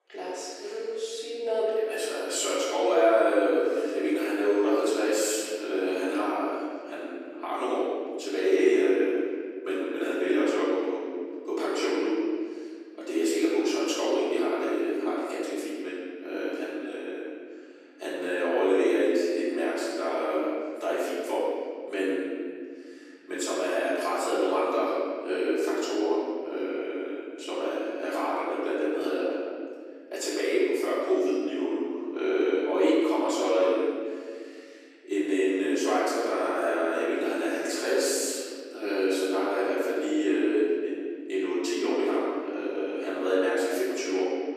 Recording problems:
room echo; strong; dies away in 2 s
off-mic speech; far
thin; somewhat; fading below 300 Hz

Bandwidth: 14.5 kHz